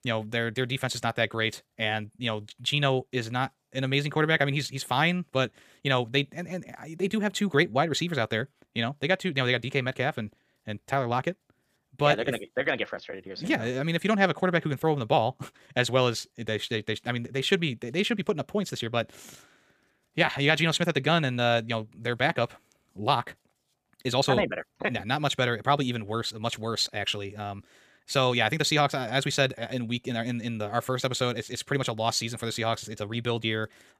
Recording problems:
wrong speed, natural pitch; too fast; 1.5 times normal speed

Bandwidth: 15 kHz